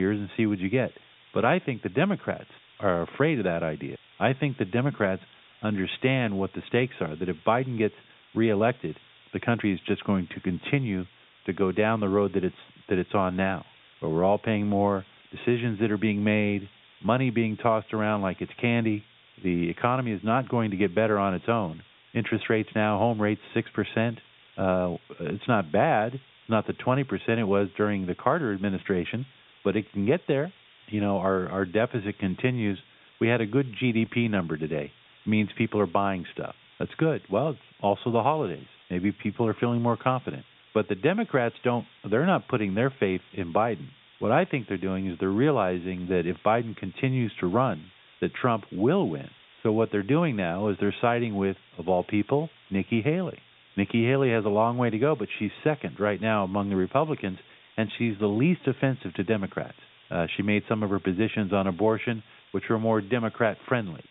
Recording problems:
high frequencies cut off; severe; nothing above 3.5 kHz
hiss; faint; throughout; 25 dB below the speech
abrupt cut into speech; at the start

